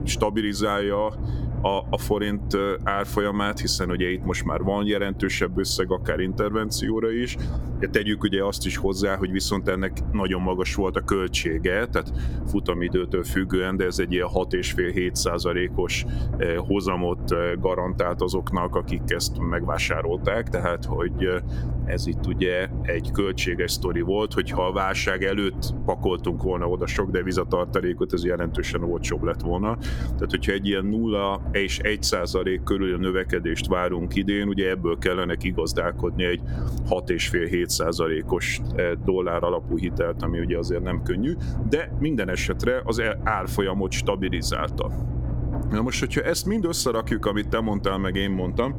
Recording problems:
squashed, flat; somewhat
low rumble; noticeable; throughout; 15 dB below the speech

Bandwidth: 17 kHz